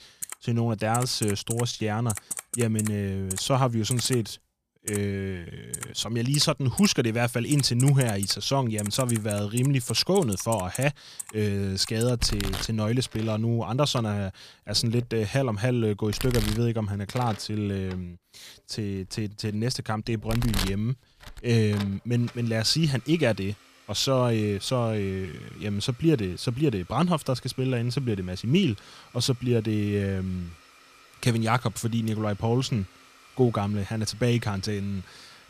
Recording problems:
household noises; loud; throughout; 9 dB below the speech

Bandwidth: 15 kHz